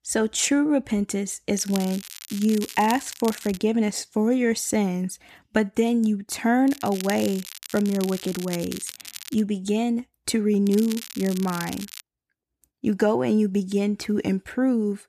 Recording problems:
crackling; noticeable; from 1.5 to 3.5 s, from 6.5 to 9.5 s and from 11 to 12 s; 15 dB below the speech

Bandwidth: 14.5 kHz